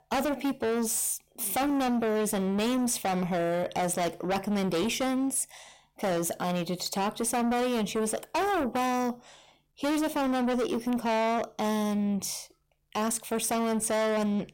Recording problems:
distortion; heavy; 6 dB below the speech

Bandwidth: 16.5 kHz